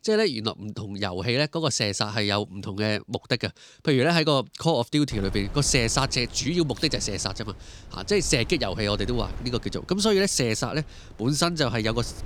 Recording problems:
wind noise on the microphone; occasional gusts; from 5 s on; 25 dB below the speech

